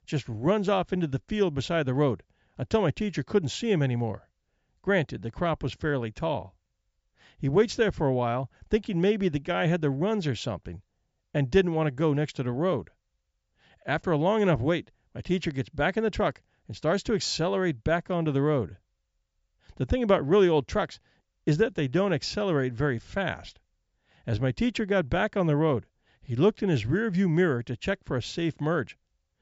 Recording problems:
high frequencies cut off; noticeable; nothing above 8 kHz

